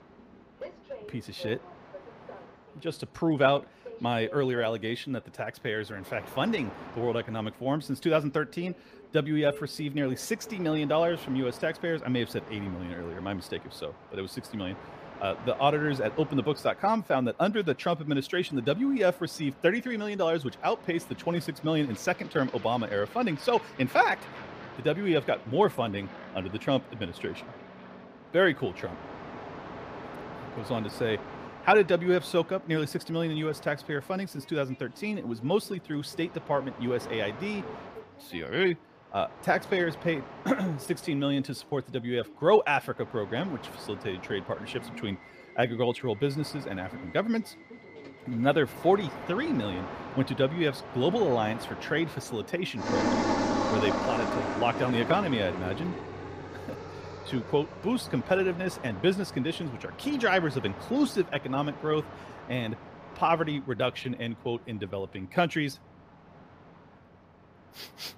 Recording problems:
train or aircraft noise; noticeable; throughout; 10 dB below the speech

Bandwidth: 15 kHz